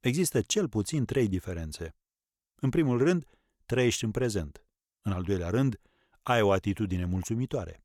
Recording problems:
none

